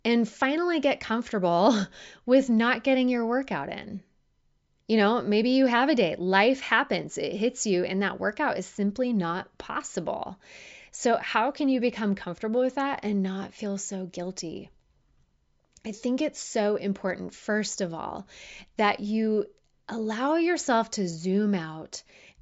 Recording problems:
high frequencies cut off; noticeable; nothing above 7.5 kHz

